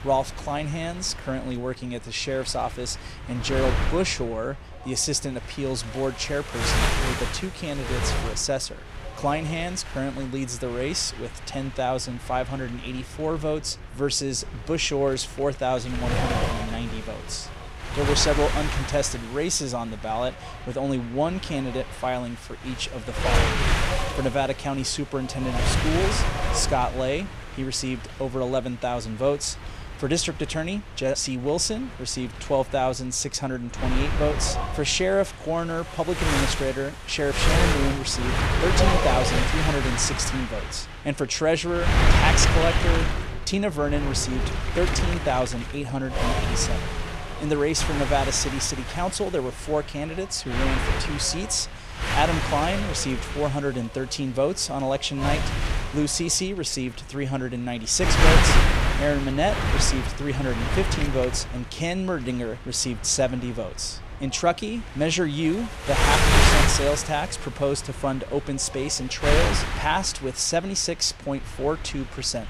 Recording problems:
wind noise on the microphone; heavy; as loud as the speech

